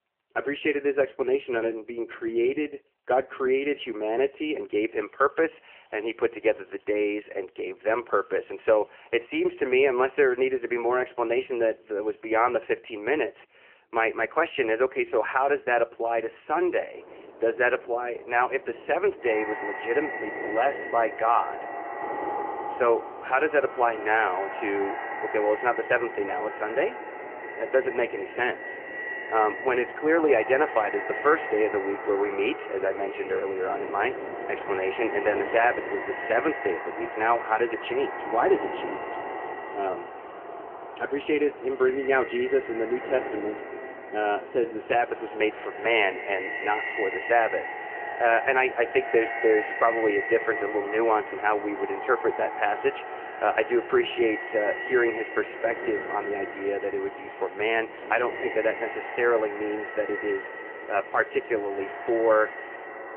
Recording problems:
echo of what is said; strong; from 19 s on; 170 ms later, 9 dB below the speech
phone-call audio; nothing above 3 kHz
wind noise on the microphone; occasional gusts; from 17 s on; 15 dB below the speech
traffic noise; faint; throughout; 20 dB below the speech

